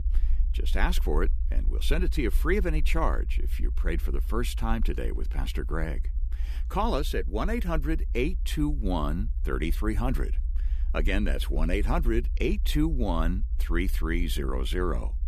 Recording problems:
low rumble; faint; throughout; 20 dB below the speech

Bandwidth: 14.5 kHz